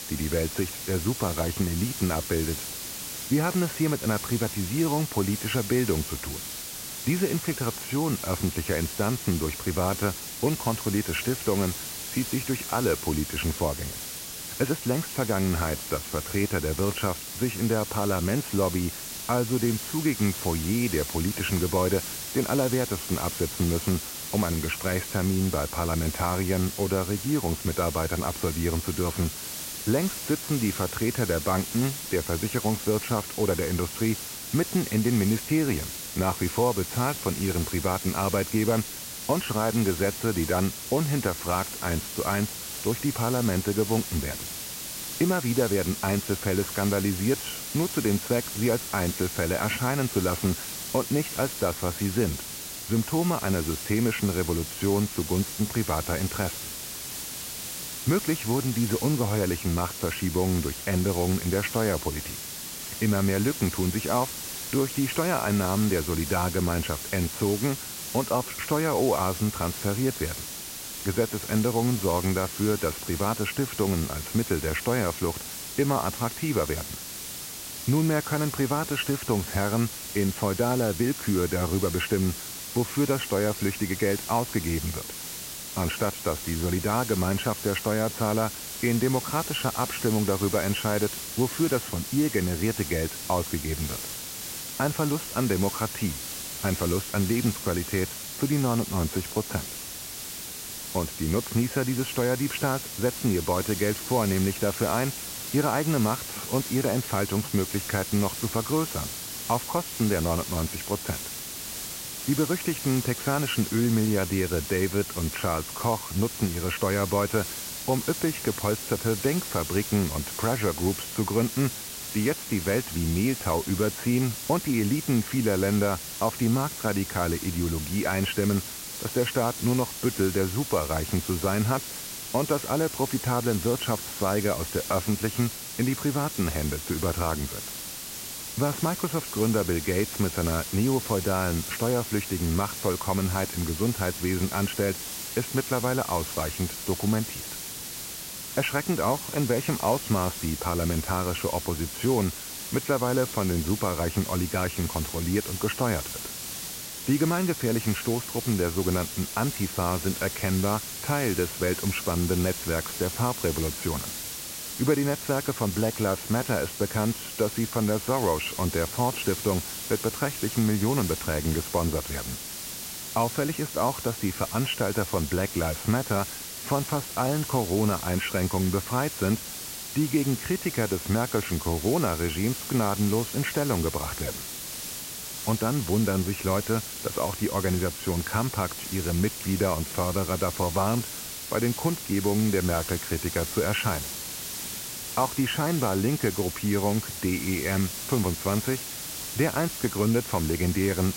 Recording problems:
high frequencies cut off; severe; nothing above 3 kHz
hiss; loud; throughout; 6 dB below the speech

